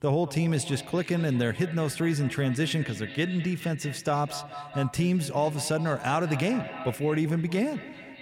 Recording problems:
echo of what is said; noticeable; throughout; 200 ms later, 15 dB below the speech

